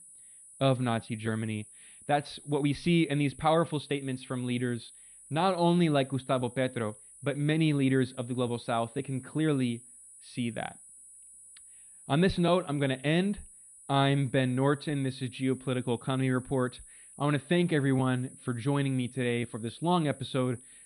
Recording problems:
muffled; slightly; fading above 3.5 kHz
high-pitched whine; noticeable; throughout; 9.5 kHz, 20 dB below the speech

